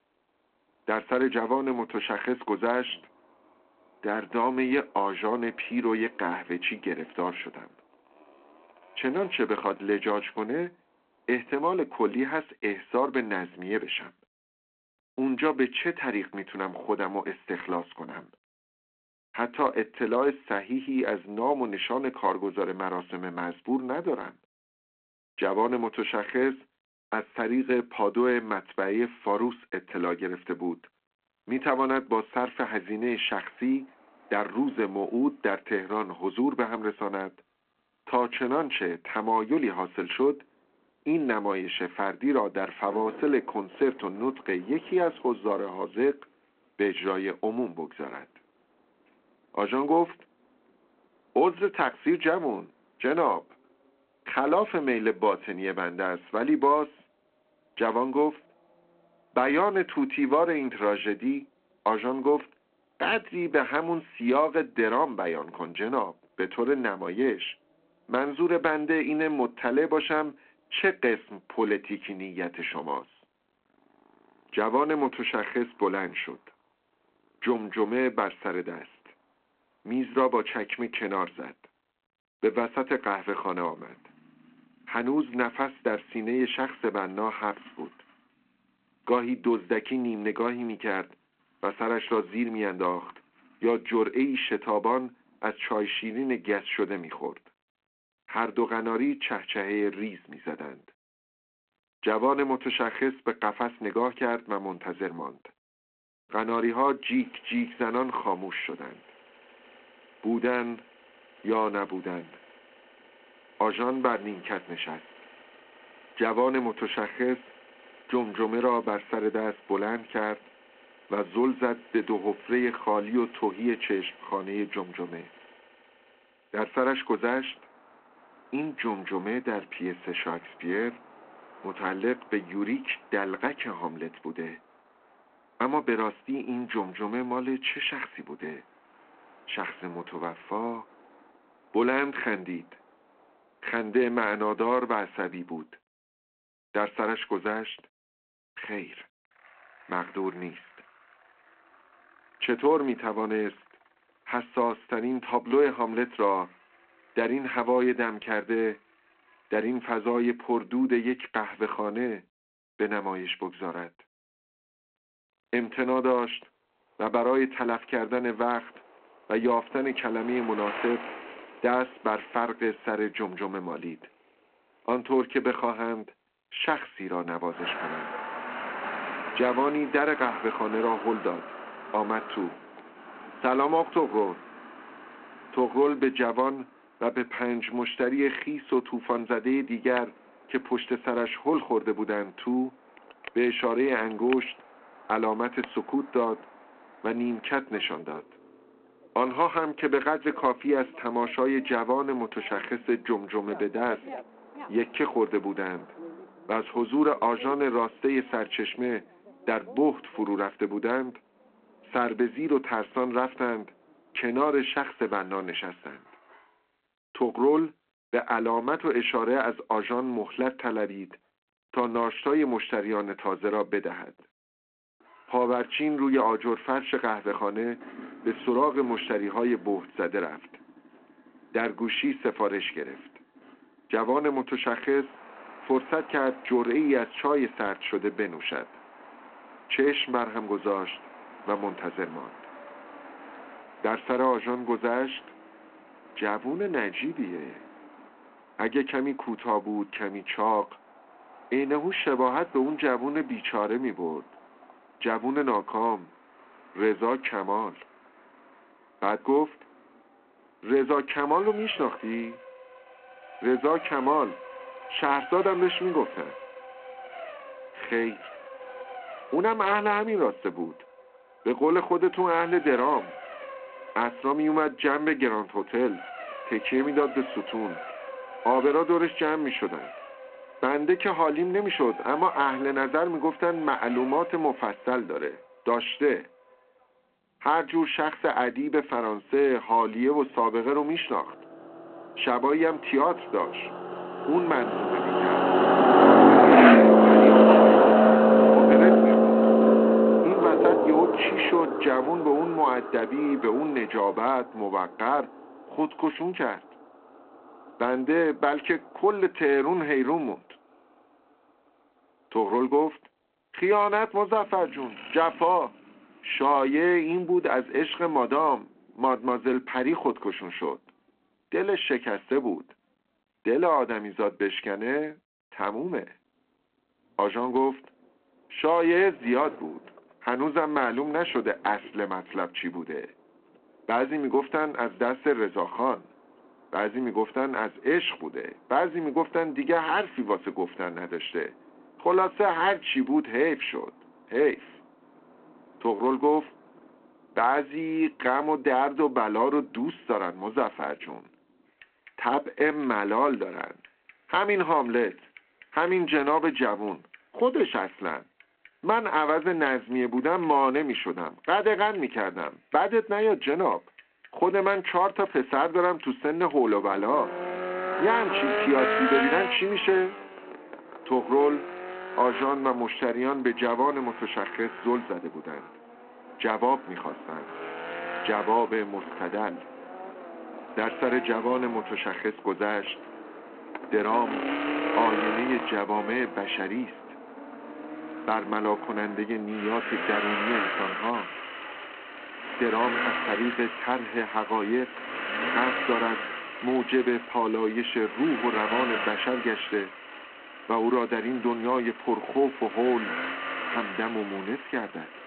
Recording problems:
phone-call audio
traffic noise; very loud; throughout; 1 dB above the speech

